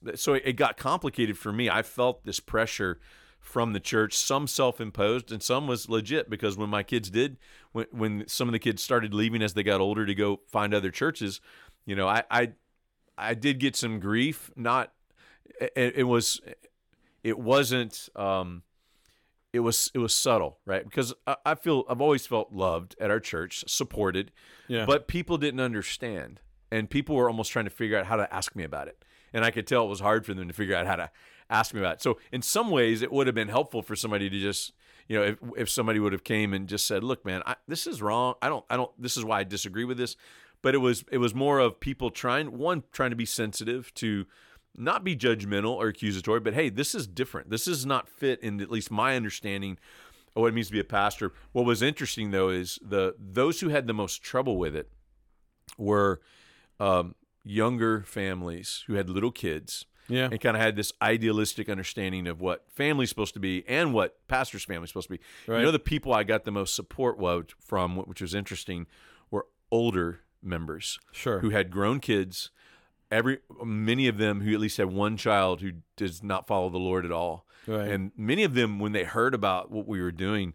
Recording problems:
none

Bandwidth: 18 kHz